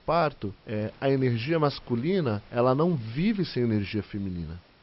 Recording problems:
high frequencies cut off; noticeable; nothing above 5.5 kHz
hiss; faint; throughout; 25 dB below the speech

